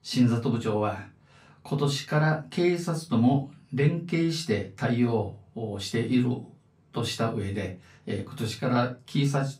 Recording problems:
off-mic speech; far
room echo; very slight; dies away in 0.2 s

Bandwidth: 15.5 kHz